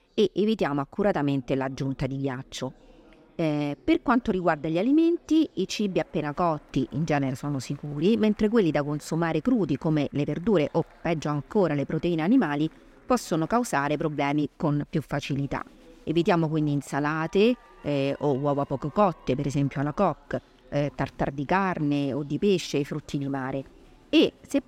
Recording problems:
chatter from many people; faint; throughout; 30 dB below the speech

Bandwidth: 16 kHz